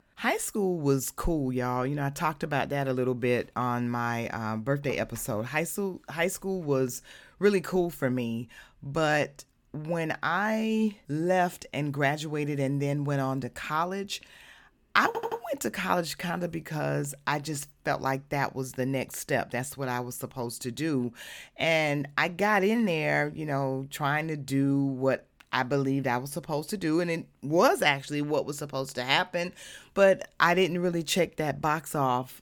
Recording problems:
audio stuttering; at 15 s

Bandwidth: 18 kHz